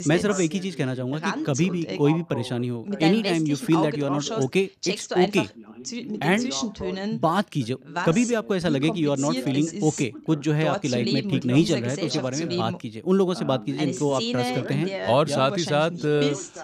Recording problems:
background chatter; loud; throughout; 2 voices, 6 dB below the speech

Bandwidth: 15 kHz